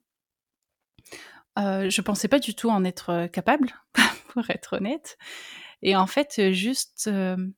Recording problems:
none

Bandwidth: 18.5 kHz